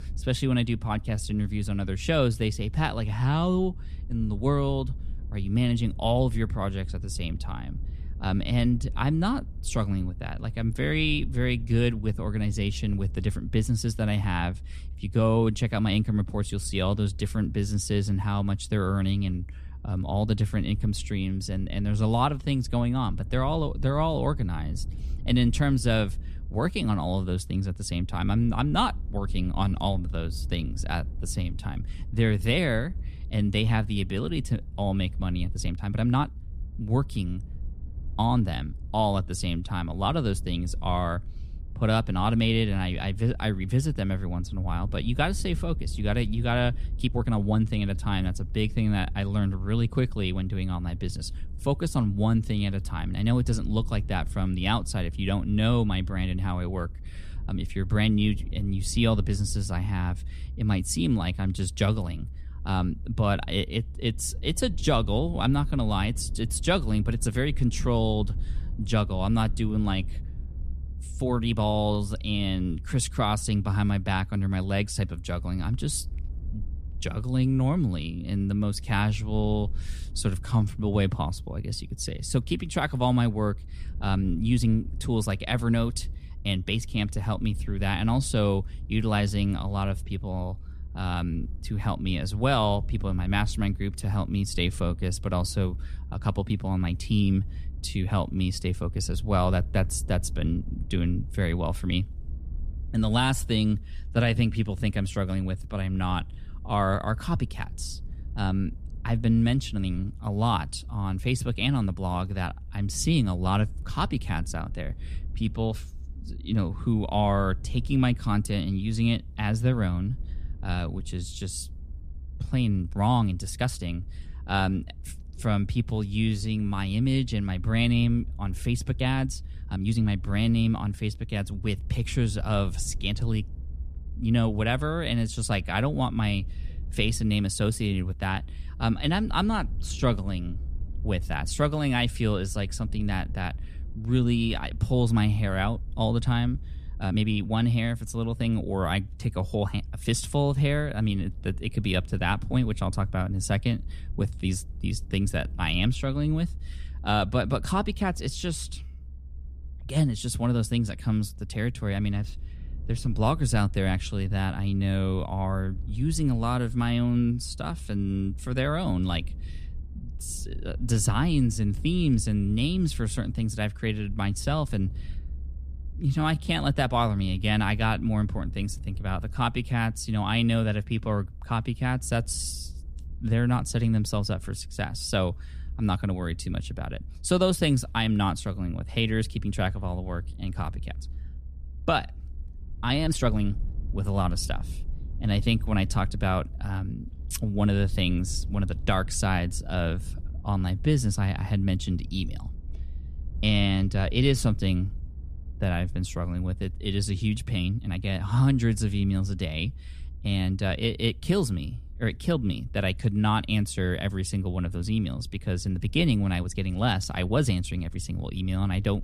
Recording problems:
low rumble; faint; throughout; 25 dB below the speech
uneven, jittery; strongly; from 1 s to 3:28

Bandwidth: 14 kHz